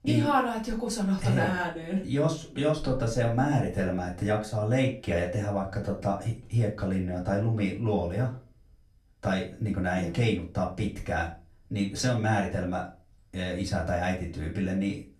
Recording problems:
off-mic speech; far
room echo; slight; dies away in 0.3 s

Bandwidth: 13.5 kHz